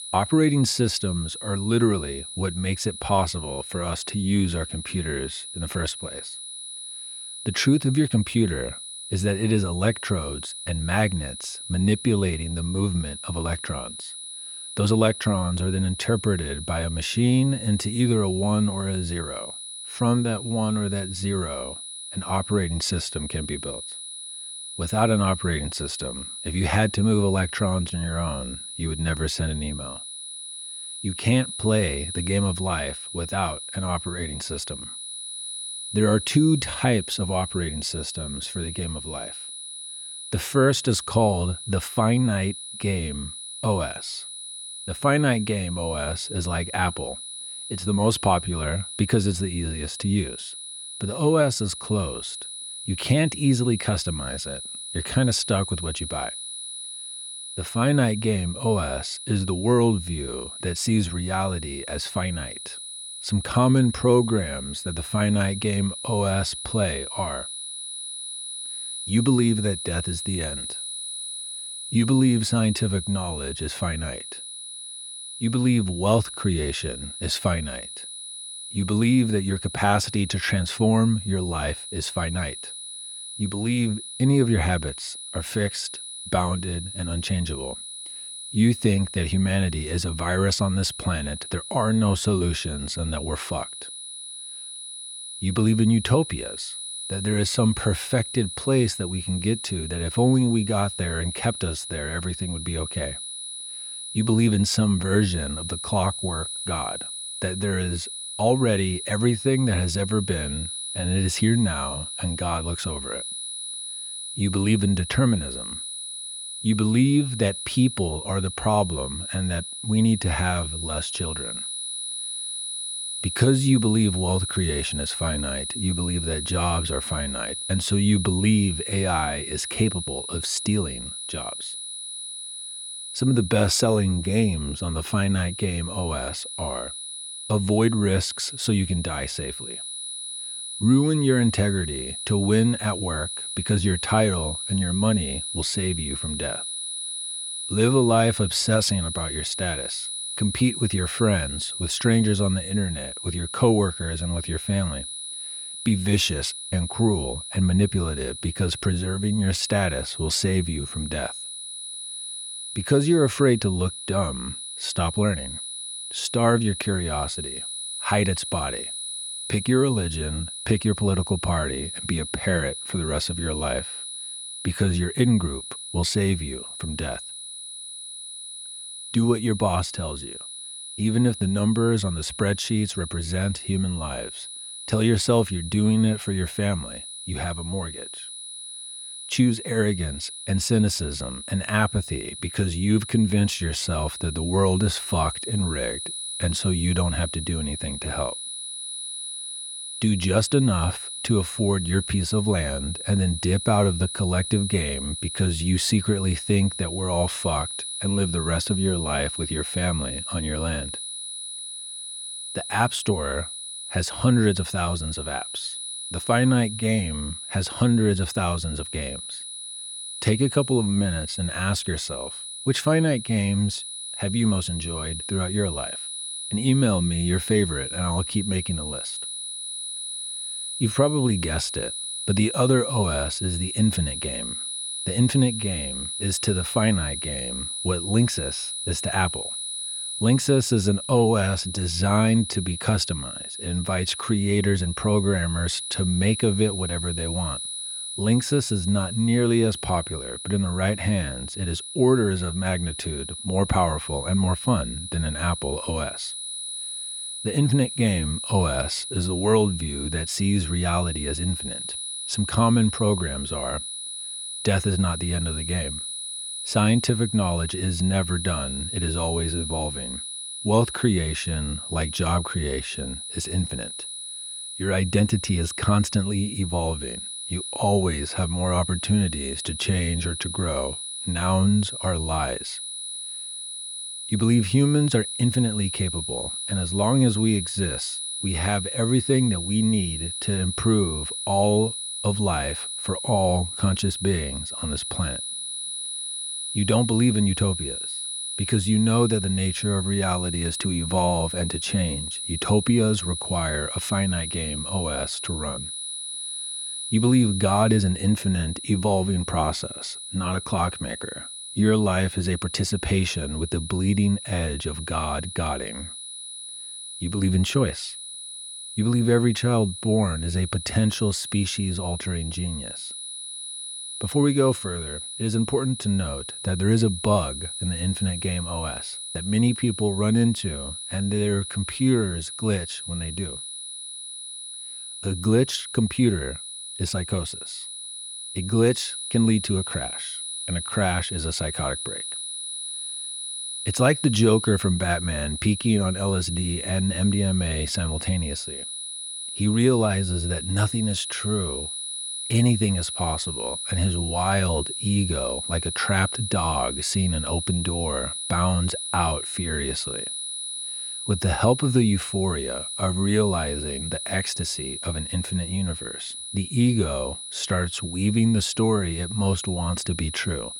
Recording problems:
high-pitched whine; loud; throughout; 10 kHz, 7 dB below the speech

